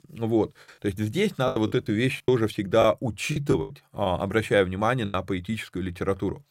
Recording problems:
choppy; very; 8% of the speech affected

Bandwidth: 16 kHz